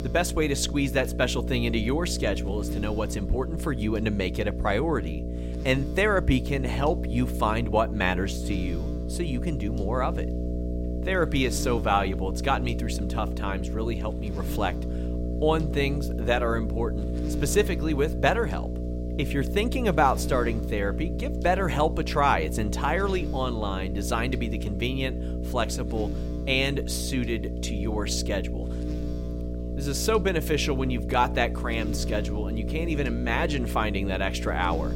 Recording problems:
electrical hum; noticeable; throughout; 60 Hz, 10 dB below the speech

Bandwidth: 16 kHz